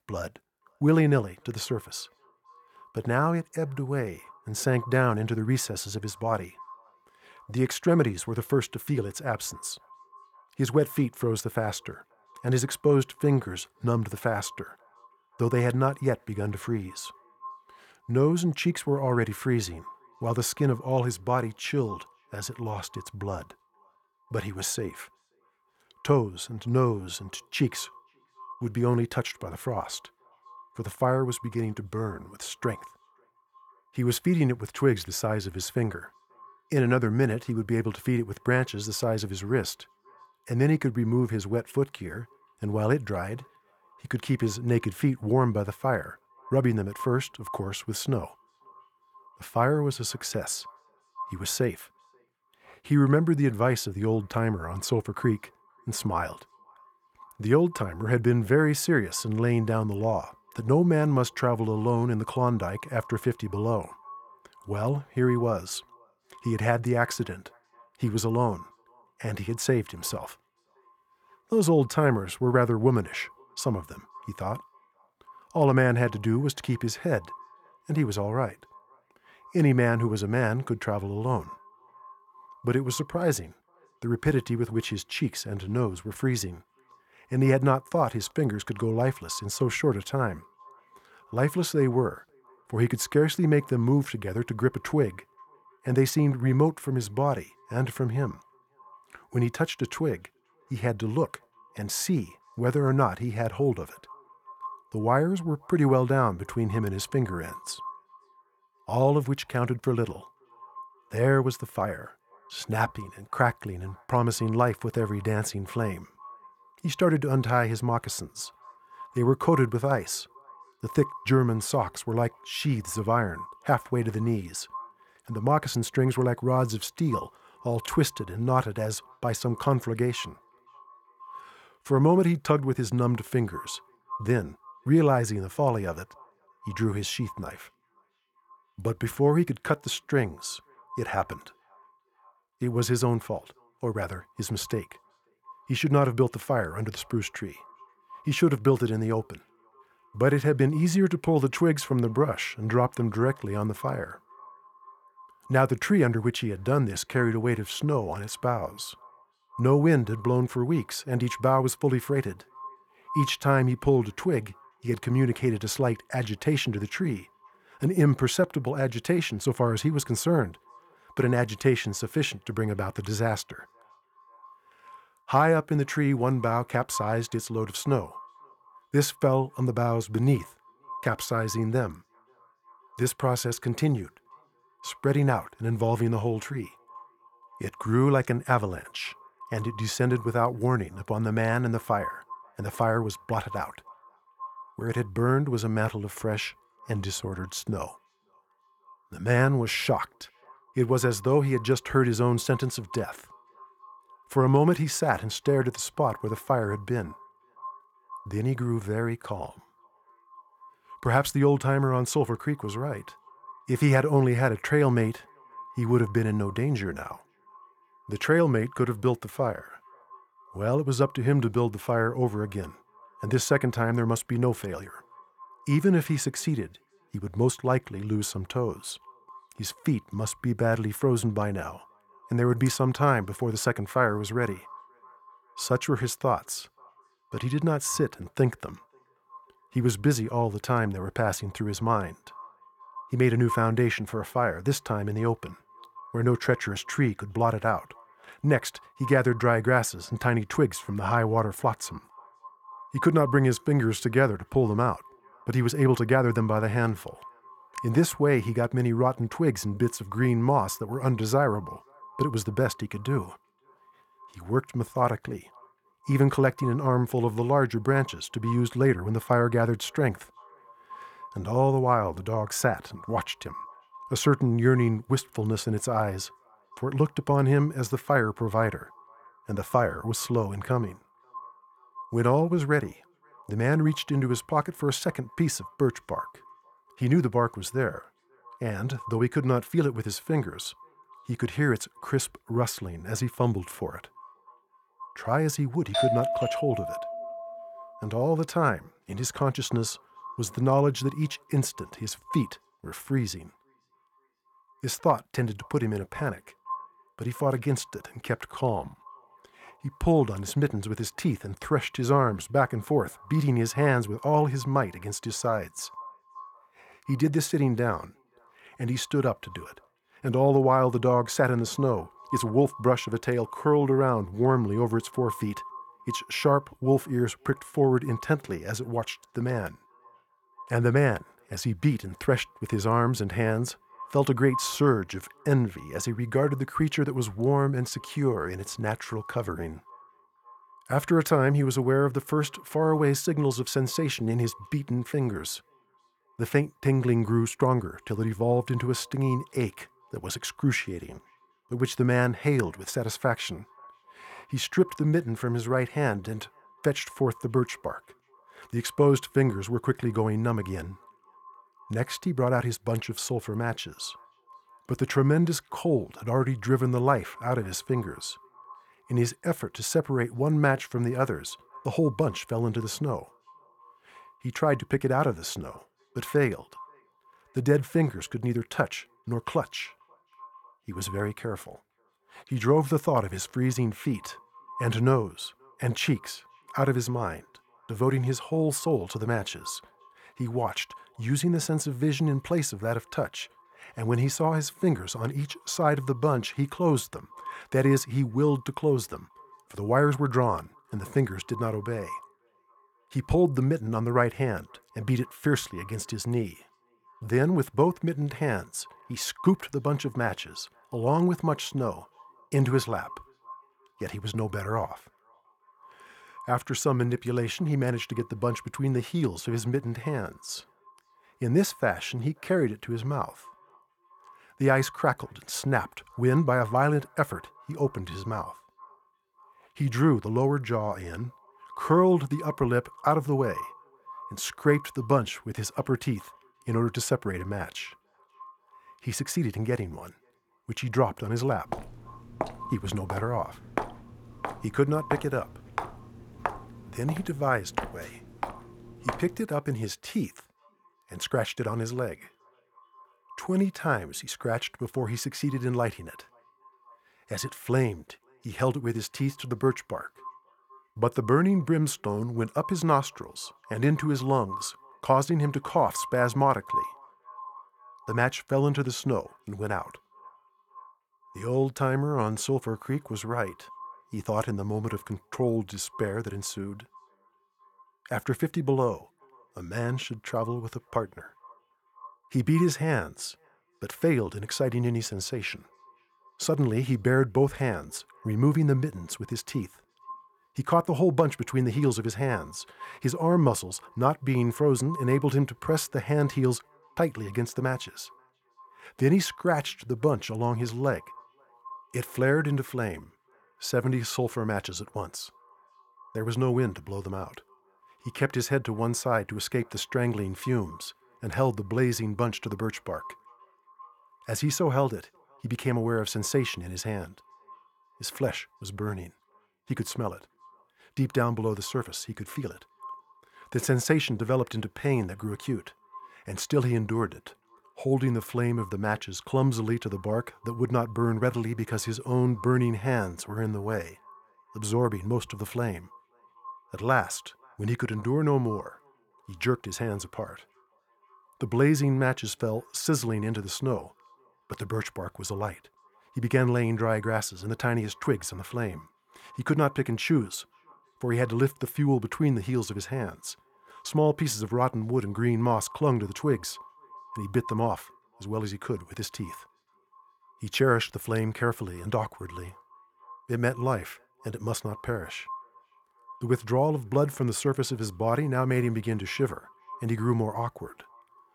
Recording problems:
echo of what is said; faint; throughout; 530 ms later, 20 dB below the speech
doorbell; loud; from 4:56 to 4:58; peak 2 dB above the speech
footsteps; noticeable; from 7:22 to 7:29; peak 7 dB below the speech

